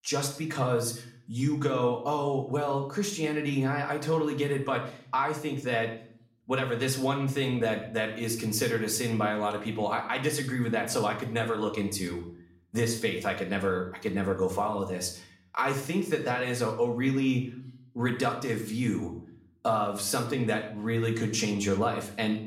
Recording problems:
room echo; slight; dies away in 0.5 s
off-mic speech; somewhat distant

